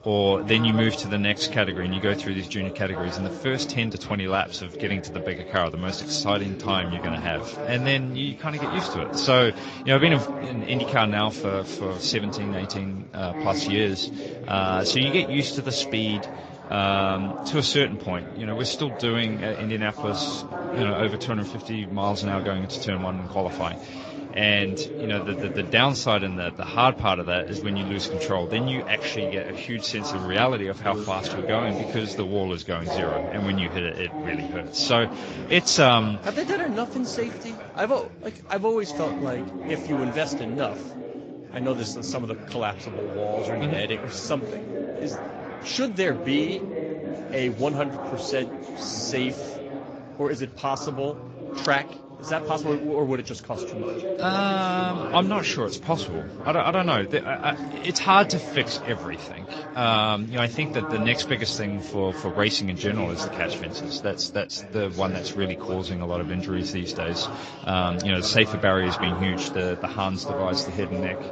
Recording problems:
garbled, watery; slightly
background chatter; loud; throughout; 3 voices, 9 dB below the speech

